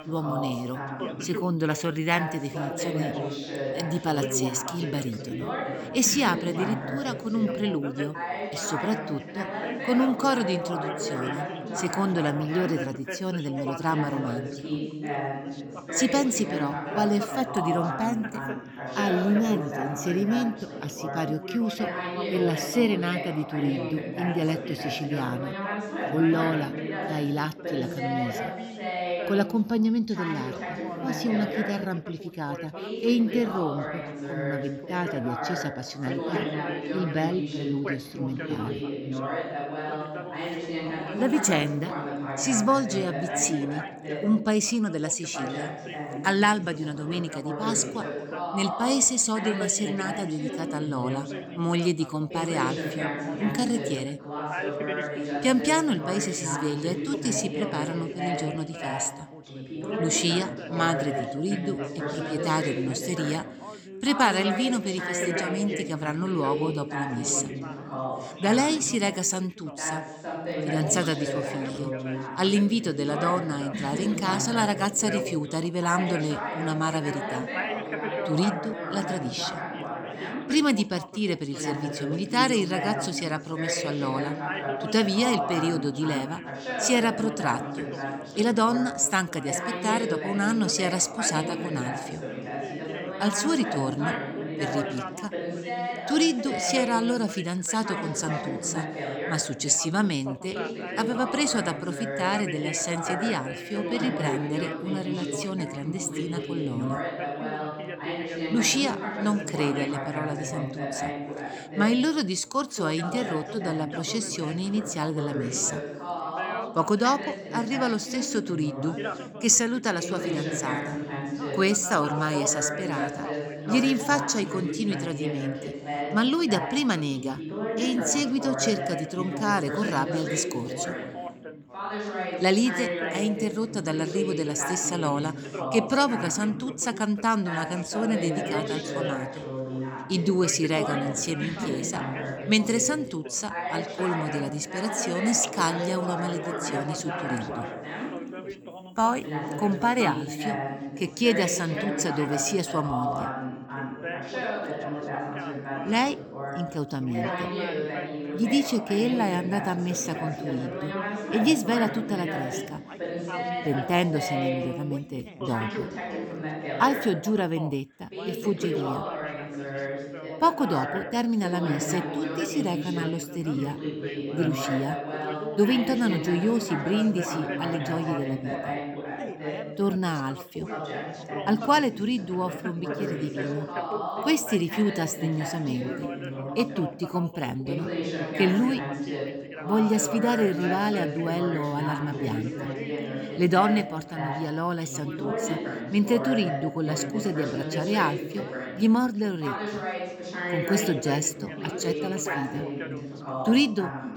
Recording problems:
background chatter; loud; throughout; 3 voices, 5 dB below the speech

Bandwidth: 18.5 kHz